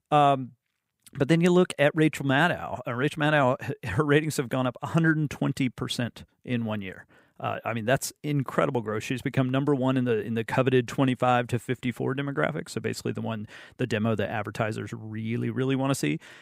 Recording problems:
none

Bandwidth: 15.5 kHz